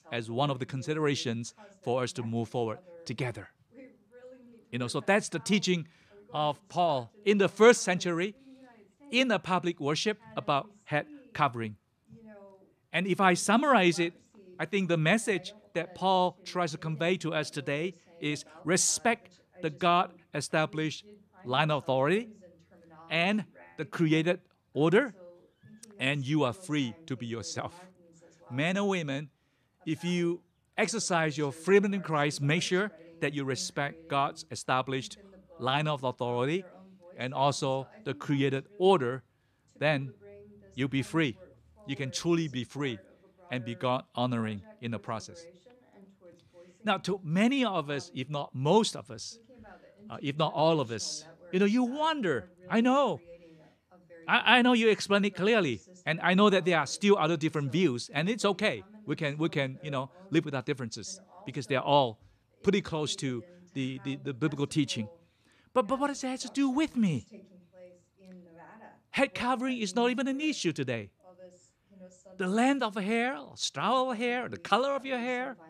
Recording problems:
voice in the background; faint; throughout; 25 dB below the speech

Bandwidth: 14 kHz